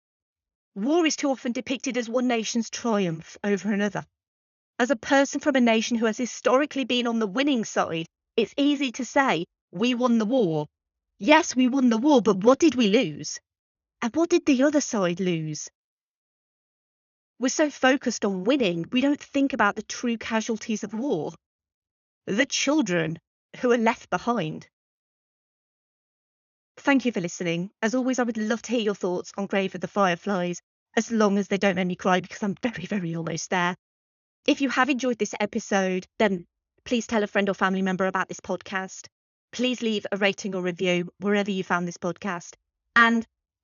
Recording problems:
high frequencies cut off; noticeable; nothing above 7 kHz

